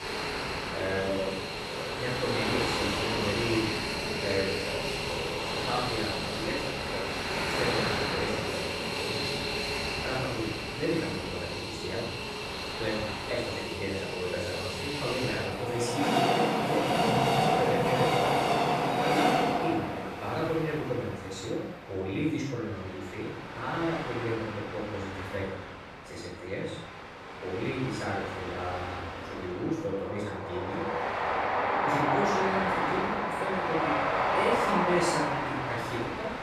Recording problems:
off-mic speech; far
room echo; noticeable; dies away in 0.5 s
train or aircraft noise; very loud; throughout; 4 dB above the speech

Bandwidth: 14.5 kHz